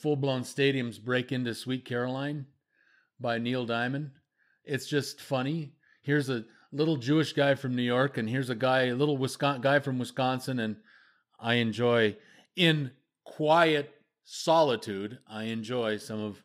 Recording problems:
none

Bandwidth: 15.5 kHz